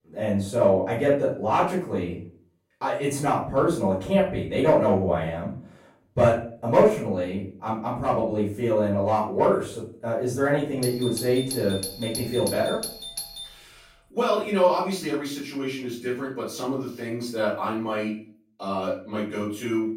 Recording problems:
off-mic speech; far
room echo; noticeable; dies away in 0.4 s
doorbell; noticeable; from 11 to 13 s; peak 6 dB below the speech

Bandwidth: 16 kHz